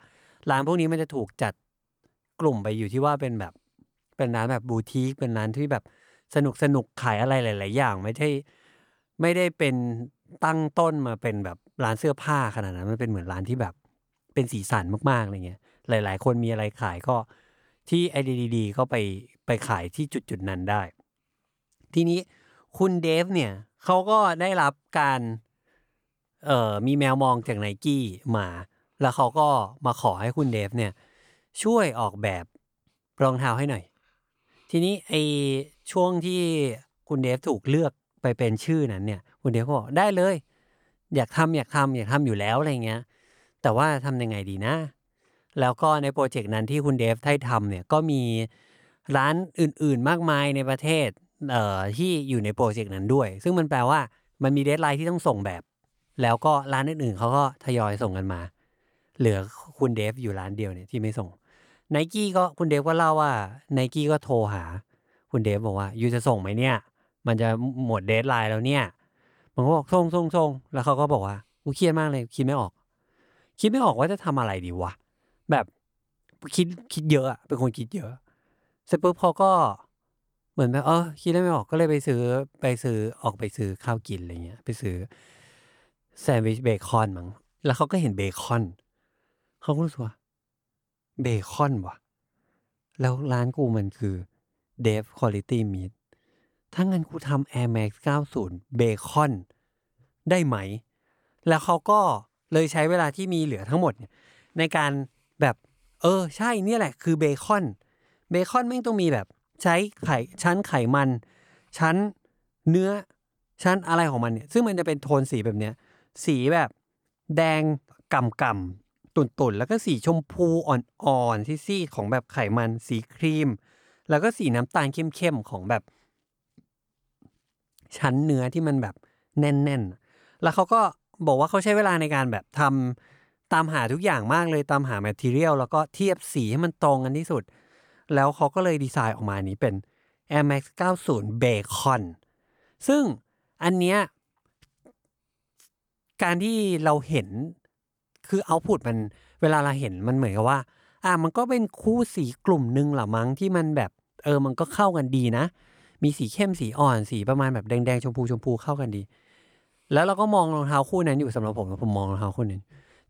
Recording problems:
none

